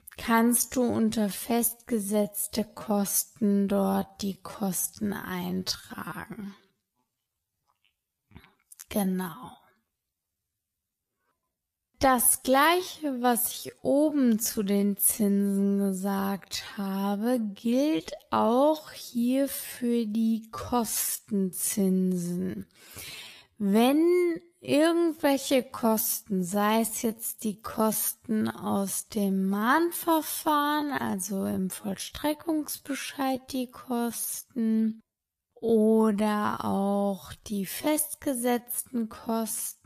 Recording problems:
wrong speed, natural pitch; too slow; 0.5 times normal speed

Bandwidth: 14.5 kHz